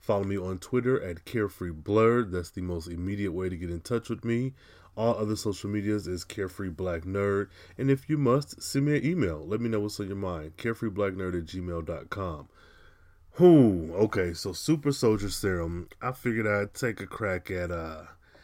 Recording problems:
none

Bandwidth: 16 kHz